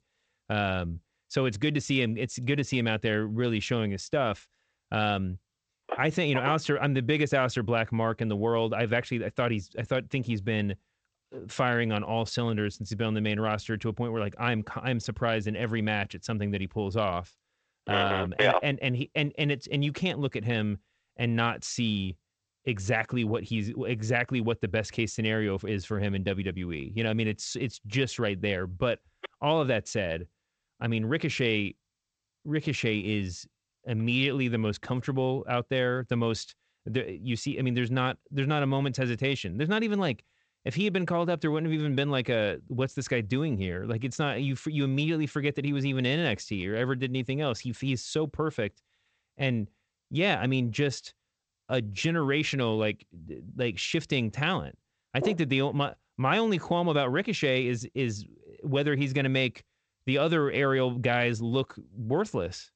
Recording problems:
garbled, watery; slightly; nothing above 8 kHz

